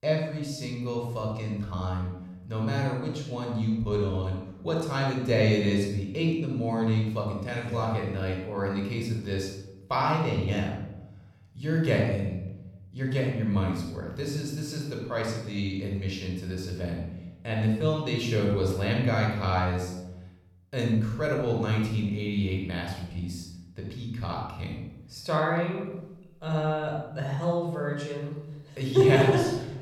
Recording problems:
room echo; noticeable; dies away in 0.8 s
off-mic speech; somewhat distant

